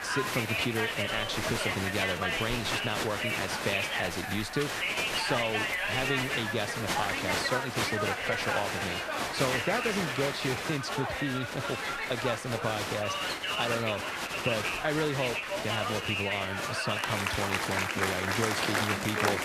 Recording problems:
crowd noise; very loud; throughout; 3 dB above the speech

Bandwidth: 14.5 kHz